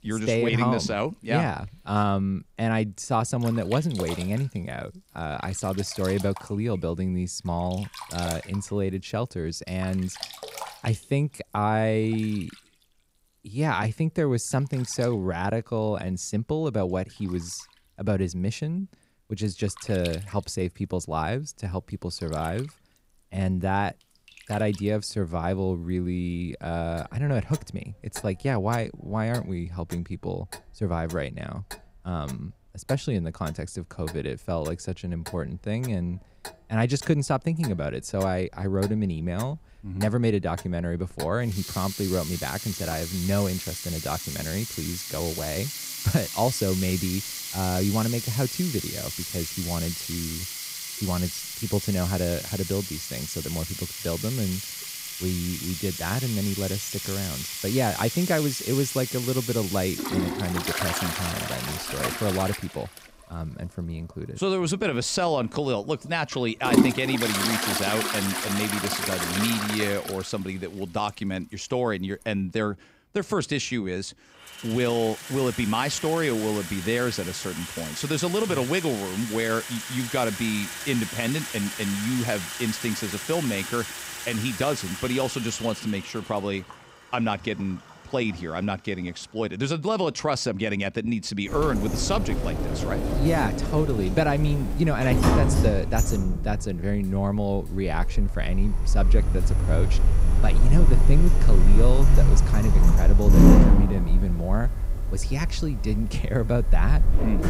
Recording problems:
household noises; very loud; throughout; as loud as the speech

